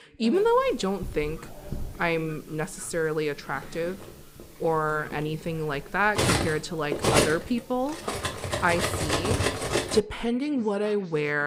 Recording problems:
background chatter; faint; throughout; 3 voices, 20 dB below the speech
clattering dishes; loud; from 1 to 10 s; peak 5 dB above the speech
abrupt cut into speech; at the end

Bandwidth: 15.5 kHz